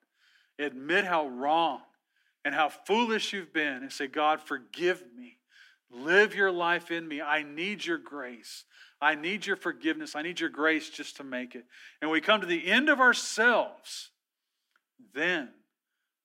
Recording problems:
thin; somewhat; fading below 250 Hz

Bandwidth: 16 kHz